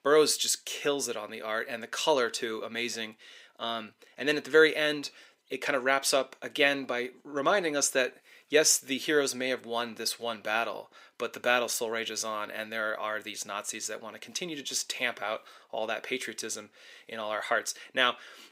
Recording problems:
thin; somewhat; fading below 400 Hz

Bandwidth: 15.5 kHz